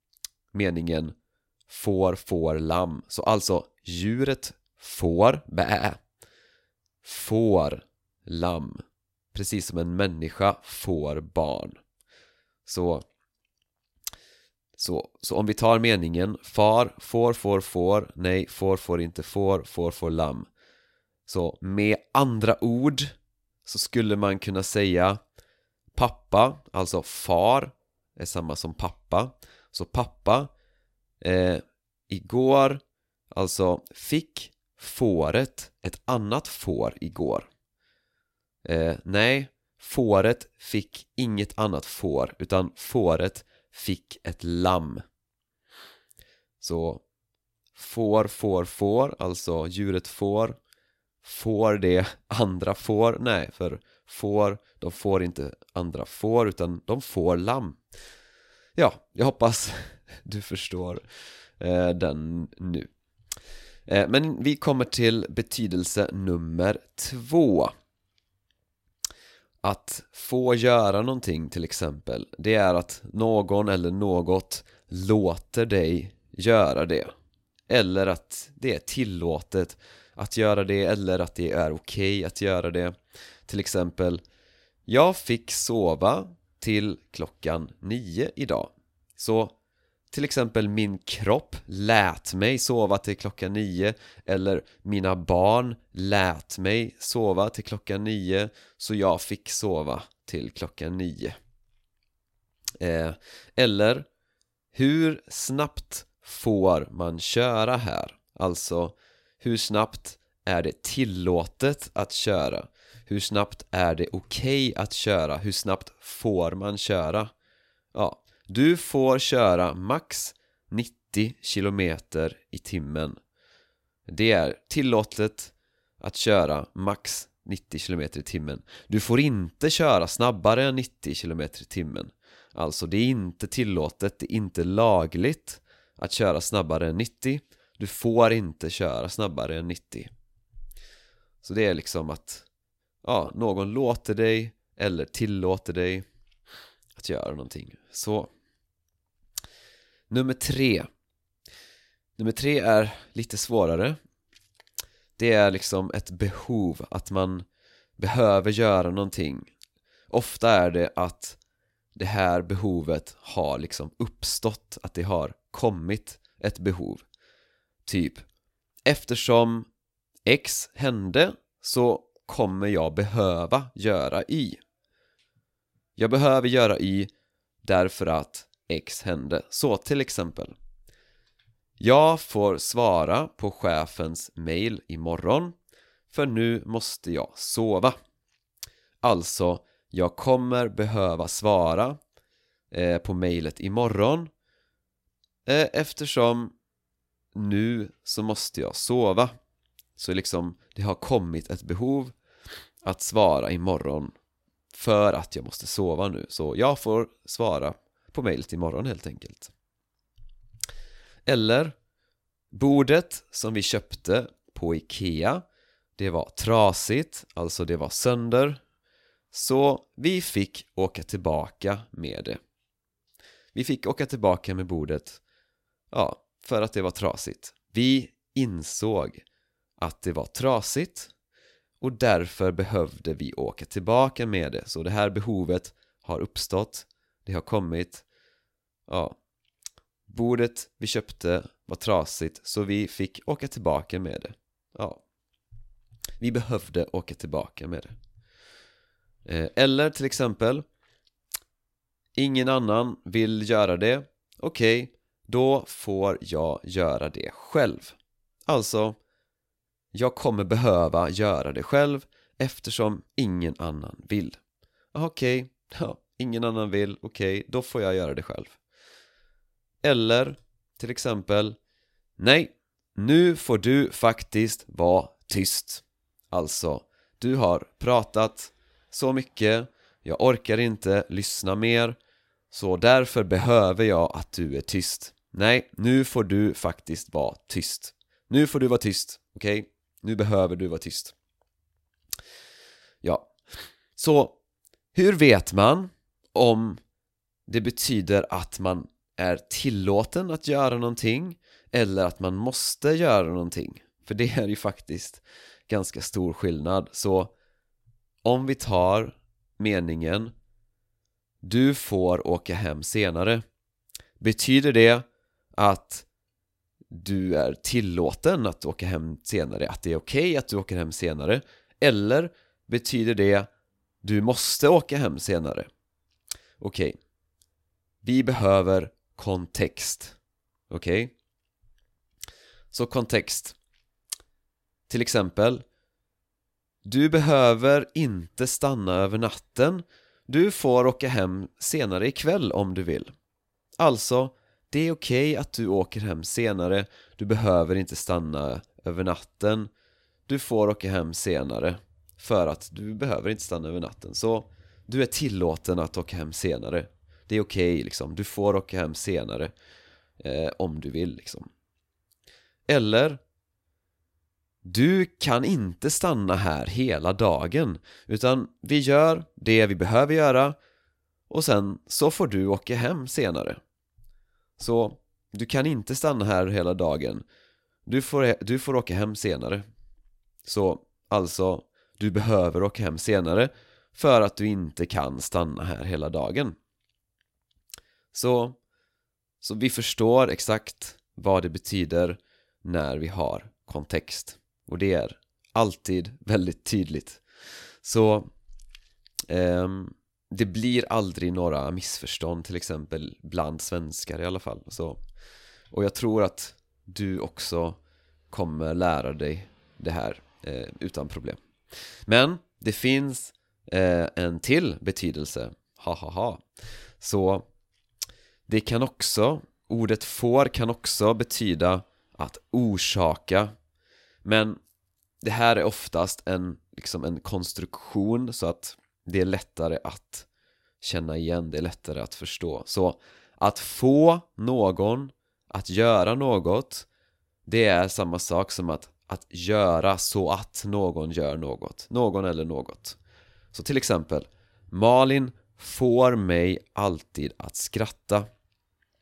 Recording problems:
none

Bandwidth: 16 kHz